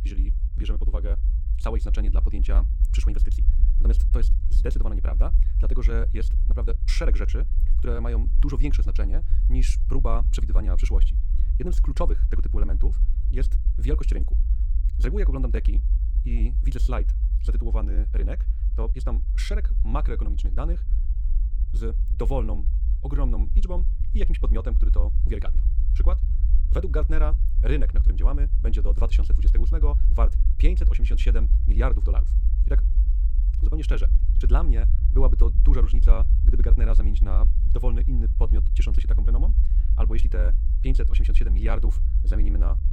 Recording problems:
wrong speed, natural pitch; too fast; 1.8 times normal speed
low rumble; loud; throughout; 10 dB below the speech

